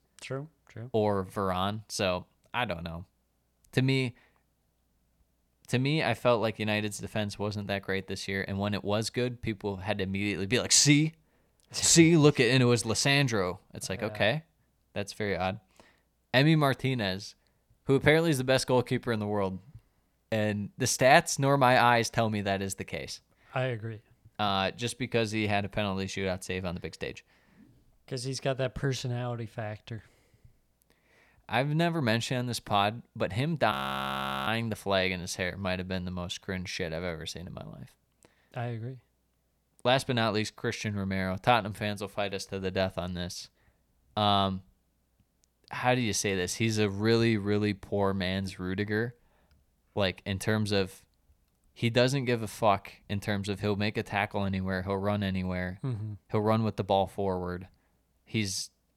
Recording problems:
audio freezing; at 34 s for 1 s

